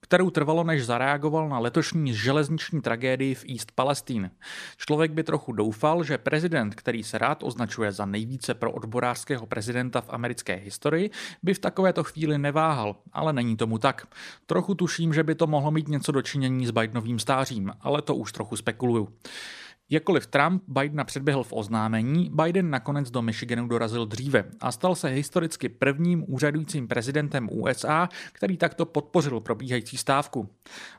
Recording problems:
none

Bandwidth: 14.5 kHz